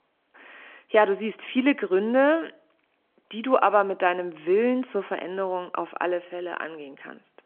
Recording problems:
phone-call audio

